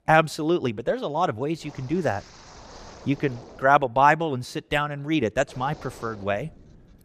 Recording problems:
wind noise on the microphone; occasional gusts; from 1.5 to 3.5 s and from 5.5 s on; 20 dB below the speech

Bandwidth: 14.5 kHz